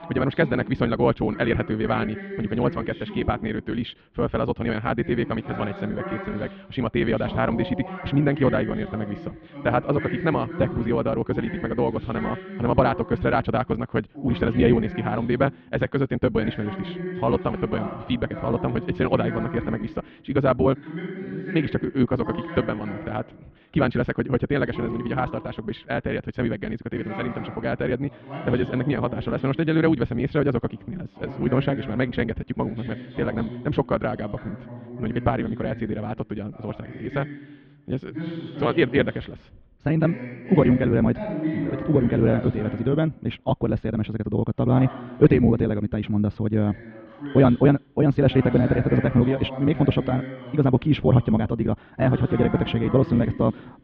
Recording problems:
muffled; very; fading above 3 kHz
wrong speed, natural pitch; too fast; 1.6 times normal speed
voice in the background; noticeable; throughout; 10 dB below the speech

